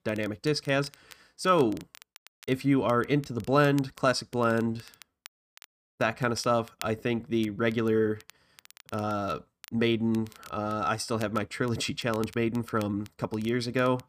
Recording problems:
crackle, like an old record; faint; 25 dB below the speech

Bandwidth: 15 kHz